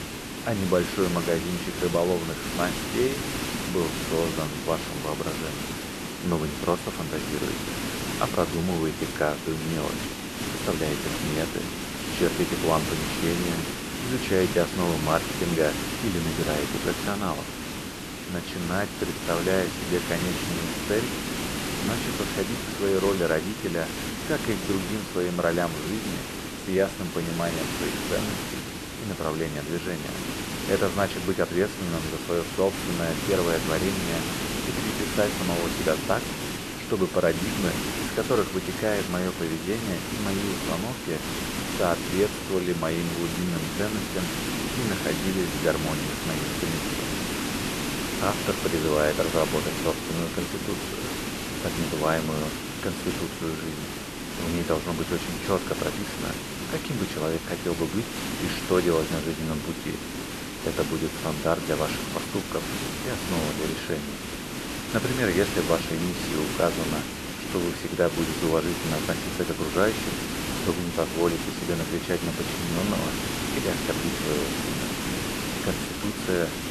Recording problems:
hiss; loud; throughout; 2 dB below the speech

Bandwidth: 13.5 kHz